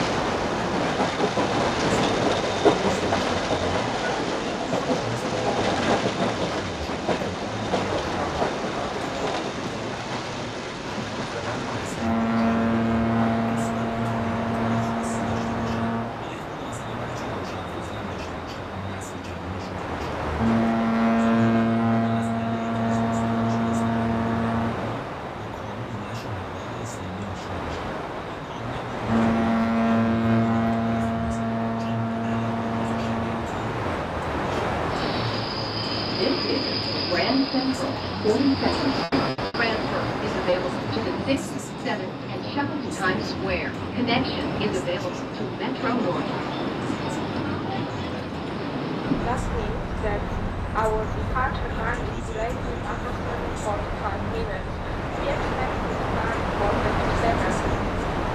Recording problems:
echo of what is said; strong; throughout; 410 ms later, 10 dB below the speech
off-mic speech; far
room echo; very slight; dies away in 0.3 s
train or aircraft noise; very loud; throughout; 10 dB above the speech
choppy; occasionally; from 39 to 41 s; 5% of the speech affected

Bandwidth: 14.5 kHz